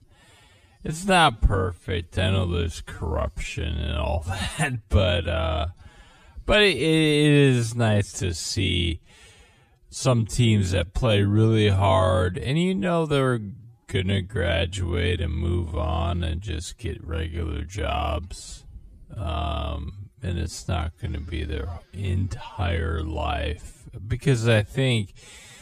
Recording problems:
wrong speed, natural pitch; too slow; 0.5 times normal speed

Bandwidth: 14.5 kHz